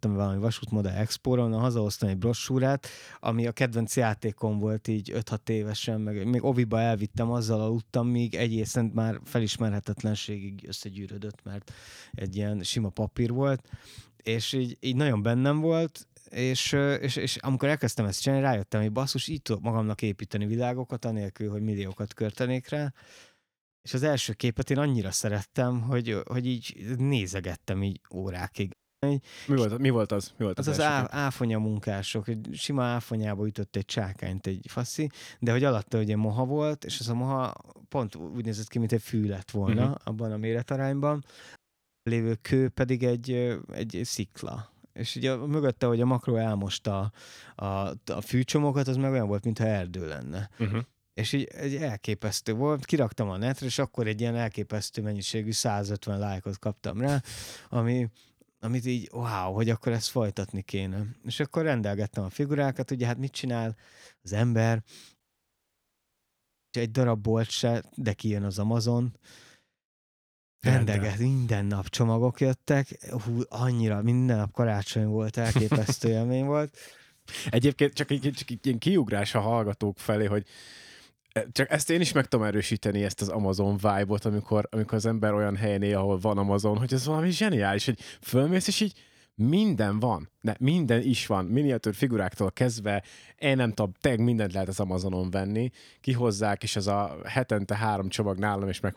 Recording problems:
audio cutting out; at 29 s, at 42 s for 0.5 s and at 1:05 for 1.5 s

